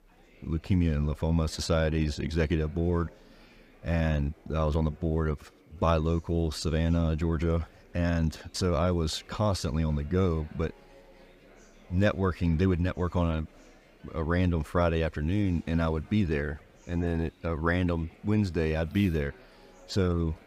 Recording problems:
murmuring crowd; faint; throughout; 25 dB below the speech

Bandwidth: 15.5 kHz